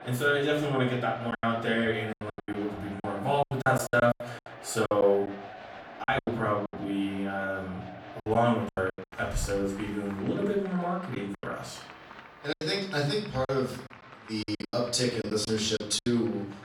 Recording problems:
off-mic speech; far
room echo; noticeable; dies away in 0.5 s
crowd noise; noticeable; throughout; 15 dB below the speech
choppy; very; 12% of the speech affected

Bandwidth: 17.5 kHz